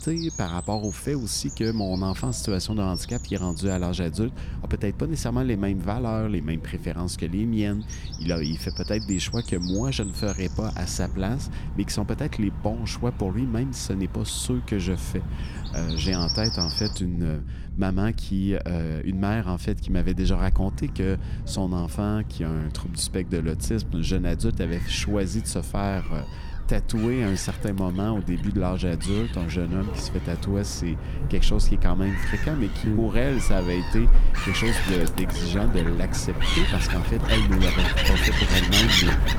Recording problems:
animal sounds; loud; throughout; 1 dB below the speech
low rumble; noticeable; throughout; 20 dB below the speech

